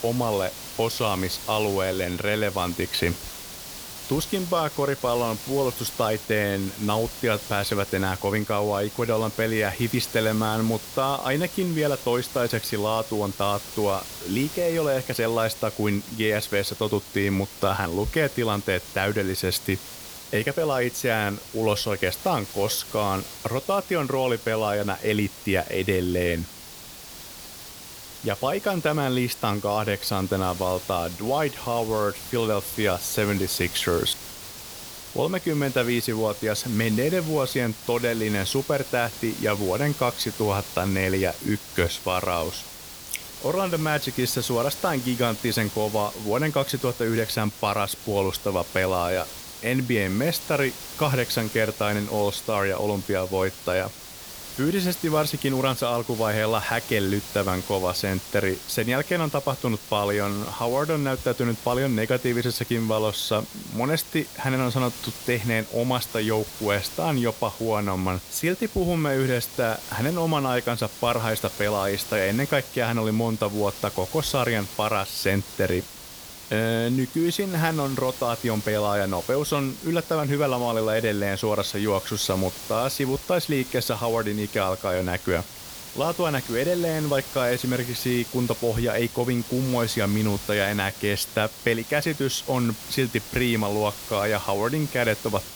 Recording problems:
hiss; noticeable; throughout; 10 dB below the speech

